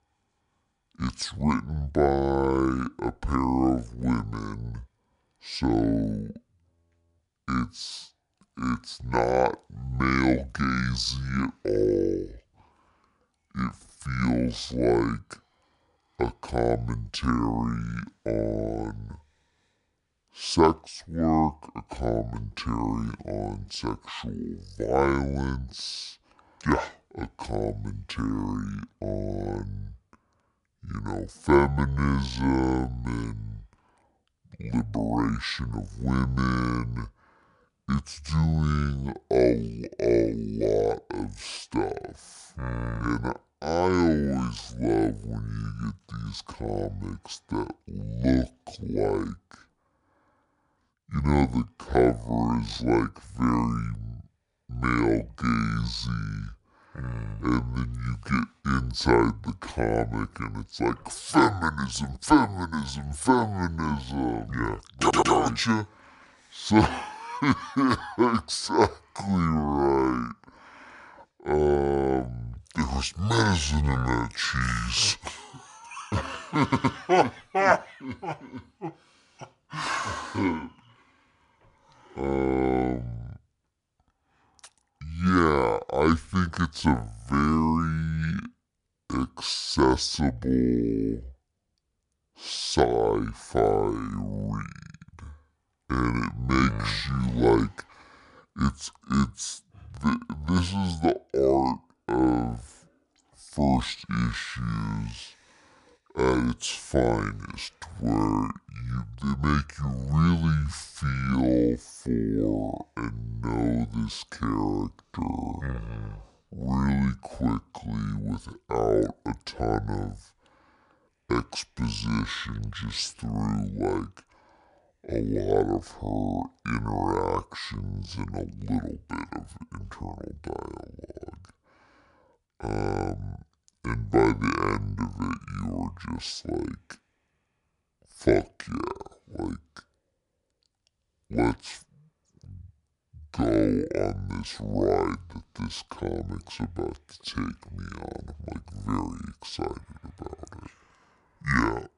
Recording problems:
wrong speed and pitch; too slow and too low; 0.6 times normal speed
audio stuttering; at 1:05 and at 1:17

